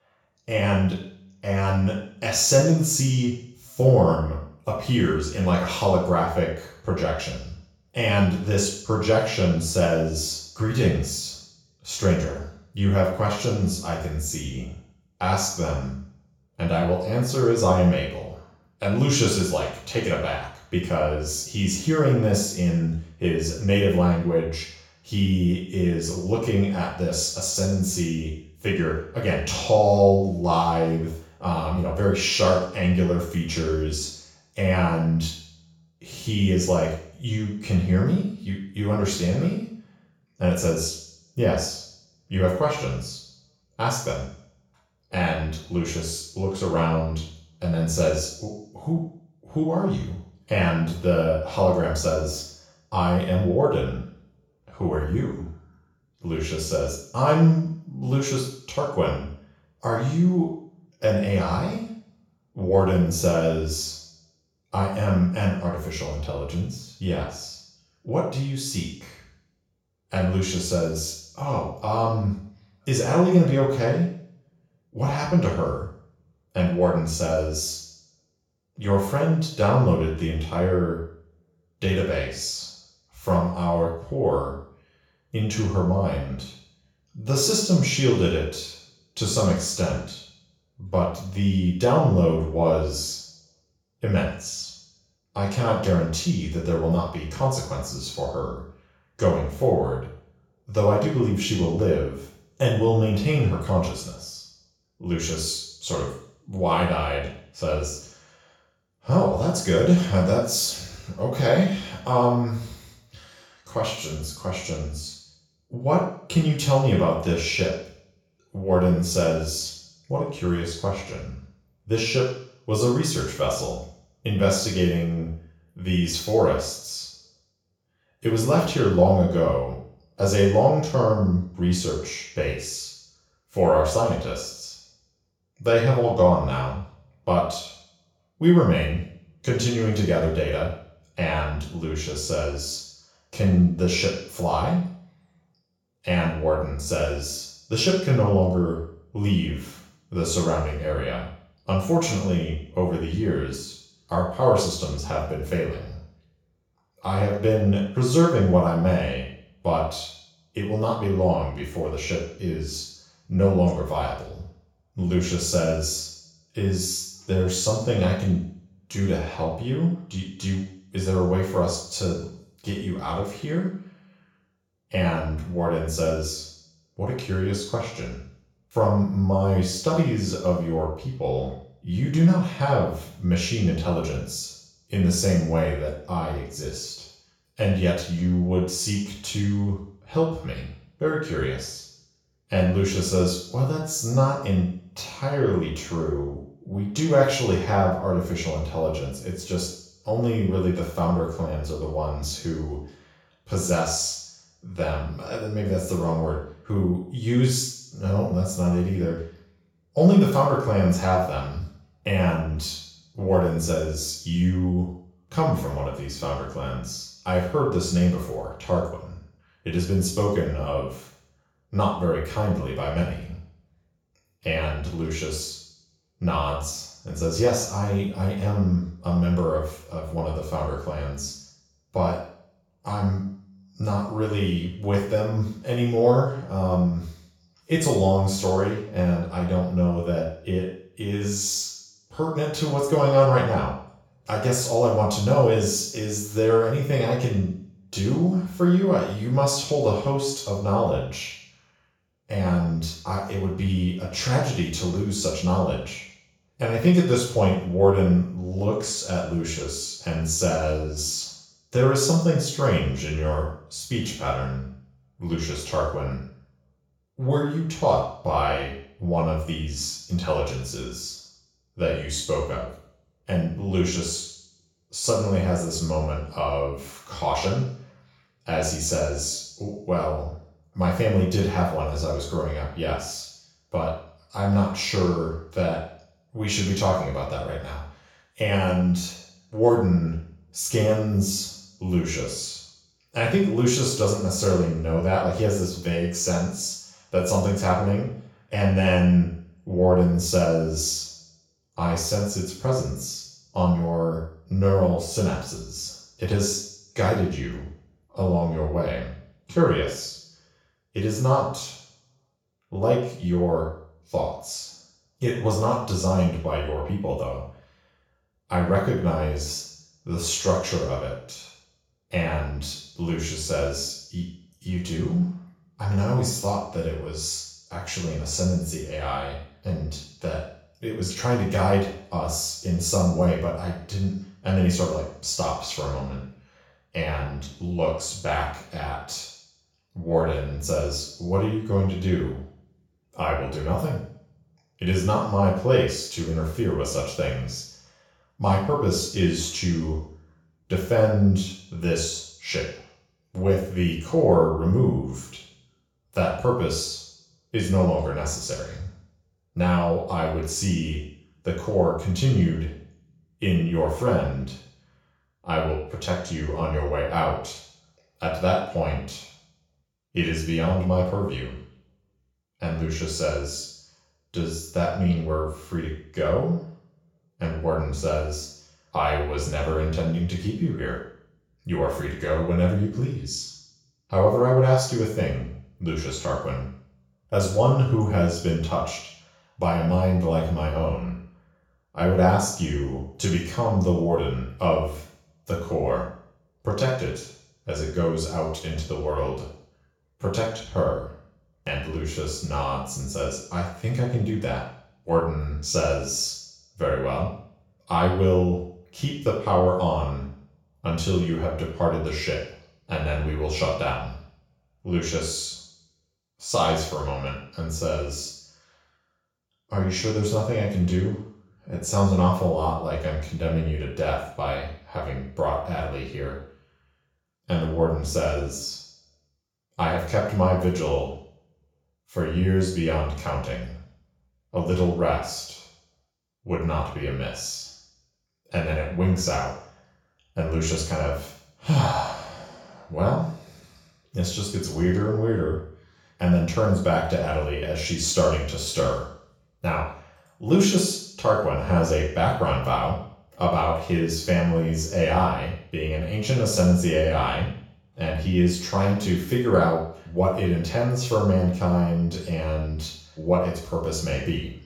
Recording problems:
off-mic speech; far
room echo; noticeable; dies away in 0.7 s

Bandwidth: 17.5 kHz